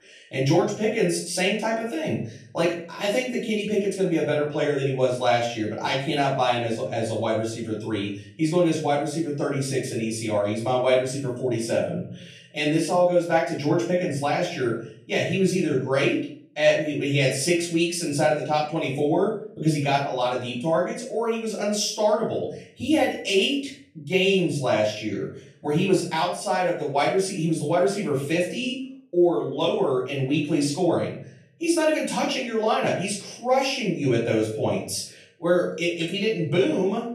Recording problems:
off-mic speech; far
room echo; noticeable; dies away in 0.5 s

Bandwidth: 13.5 kHz